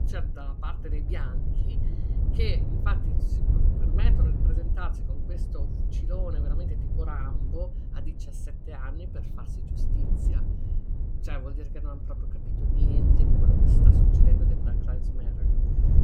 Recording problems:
wind noise on the microphone; heavy; as loud as the speech

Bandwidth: 18 kHz